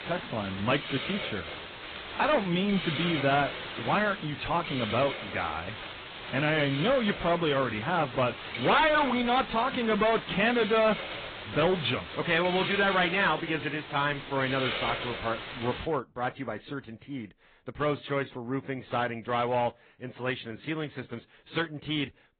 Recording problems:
distortion; heavy; 6% of the sound clipped
high frequencies cut off; severe; nothing above 4 kHz
garbled, watery; slightly
hiss; loud; until 16 s; 8 dB below the speech

